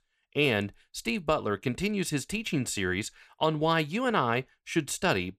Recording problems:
none

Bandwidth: 14 kHz